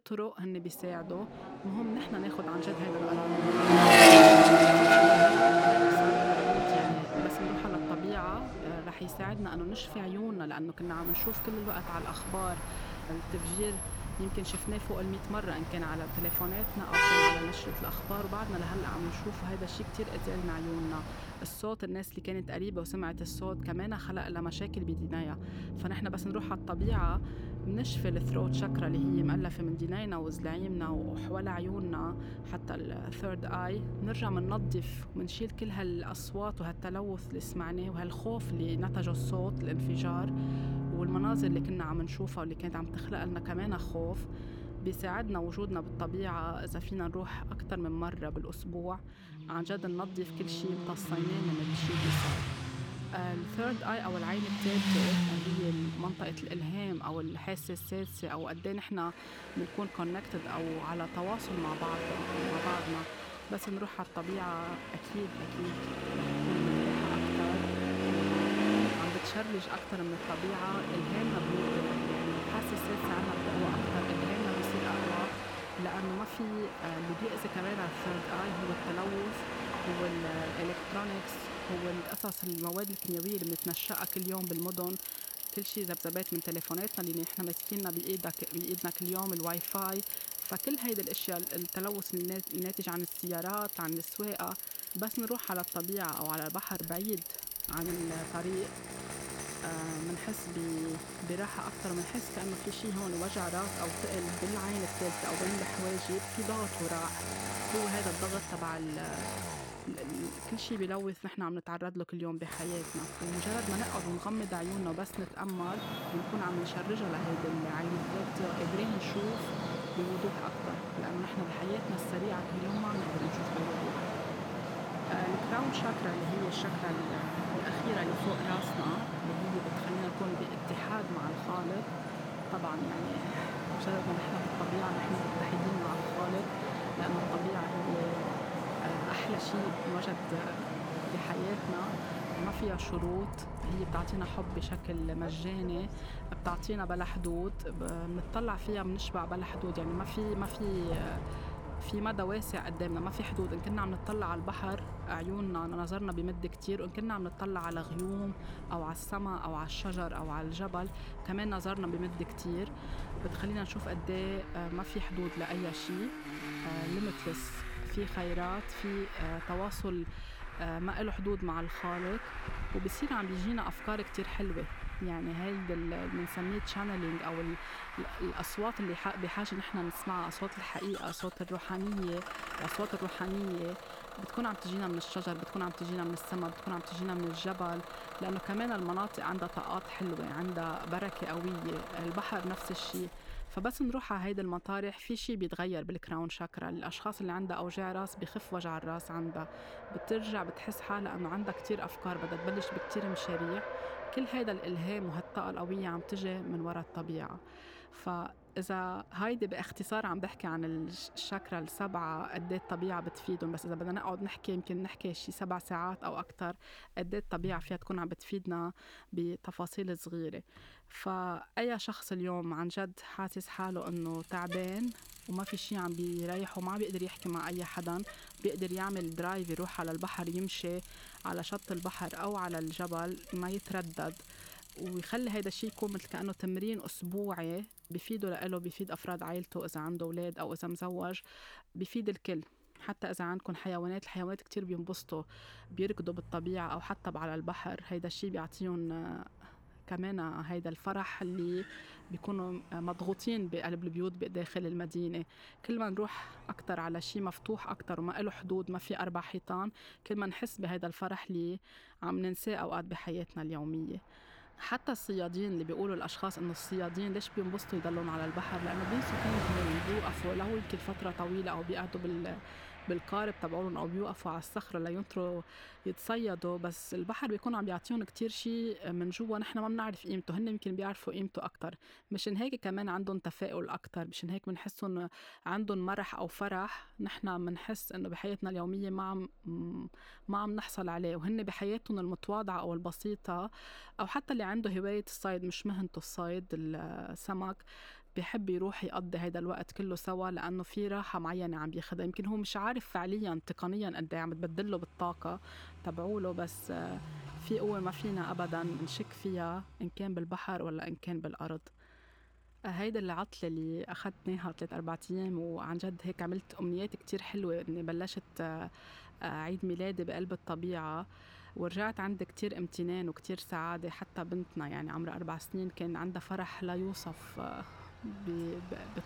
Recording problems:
traffic noise; very loud; throughout; 5 dB above the speech

